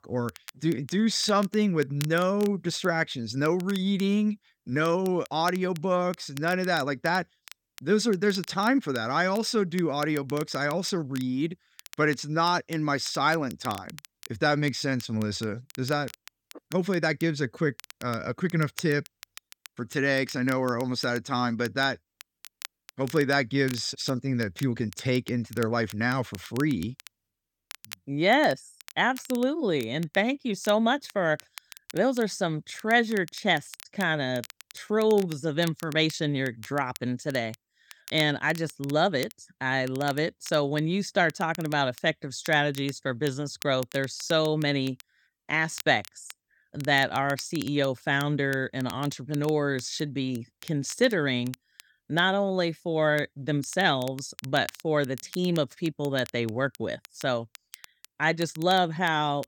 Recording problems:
crackle, like an old record; noticeable; 20 dB below the speech

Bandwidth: 17.5 kHz